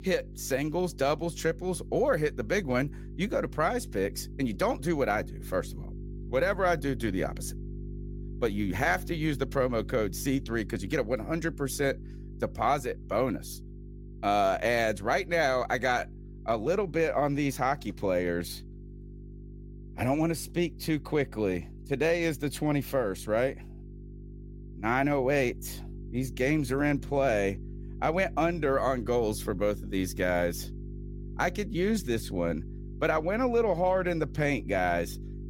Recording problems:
electrical hum; faint; throughout; 50 Hz, 25 dB below the speech

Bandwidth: 16 kHz